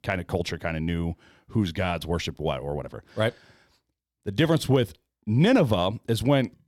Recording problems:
none

